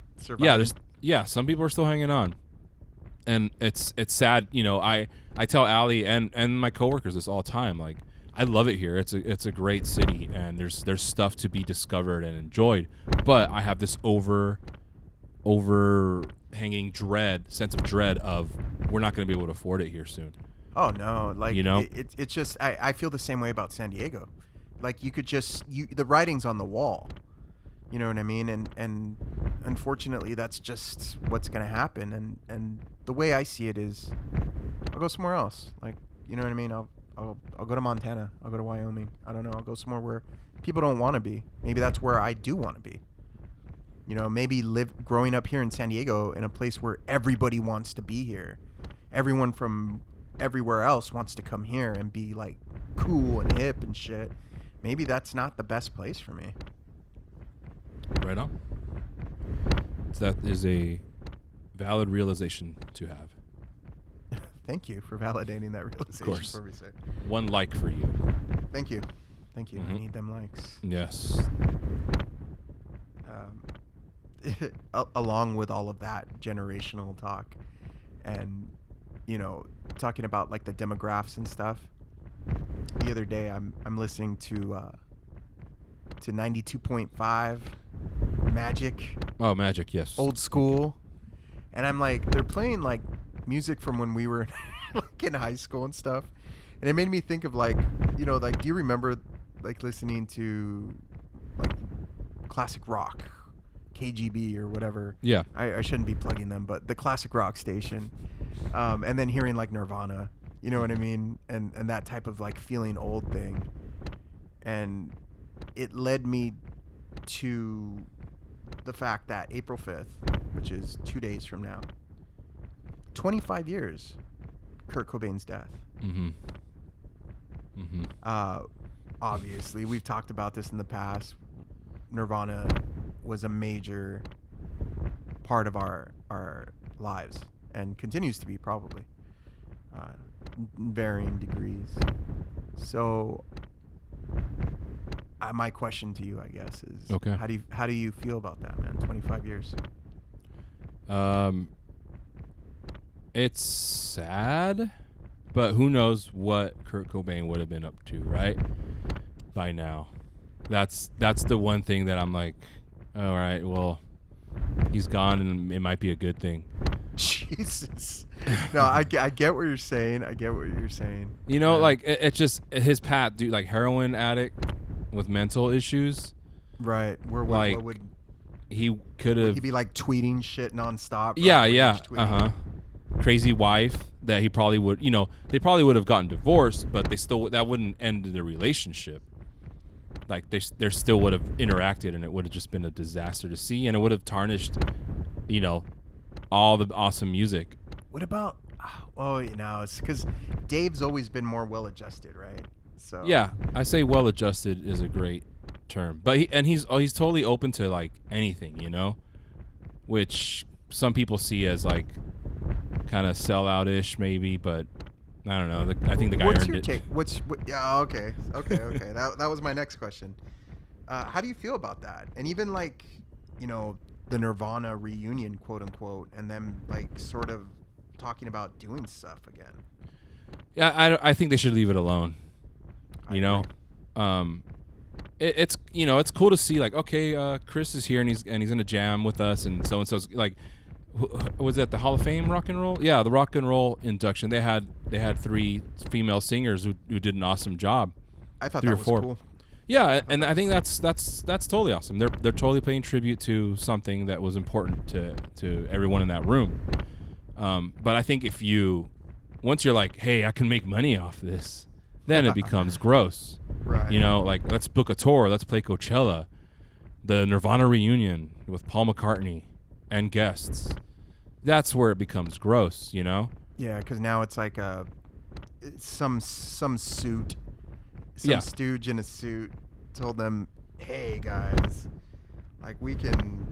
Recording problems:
garbled, watery; slightly; nothing above 15.5 kHz
wind noise on the microphone; occasional gusts; 15 dB below the speech

